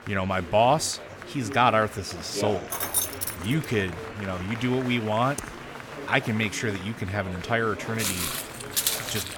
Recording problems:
chatter from many people; noticeable; throughout; 10 dB below the speech
jangling keys; loud; at 2.5 s; peak 2 dB above the speech
keyboard typing; faint; at 5.5 s; peak 15 dB below the speech
footsteps; loud; from 8 s on; peak 2 dB above the speech

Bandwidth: 17.5 kHz